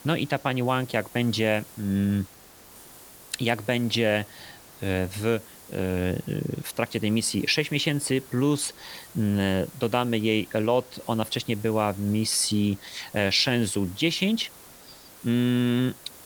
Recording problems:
hiss; noticeable; throughout; 20 dB below the speech

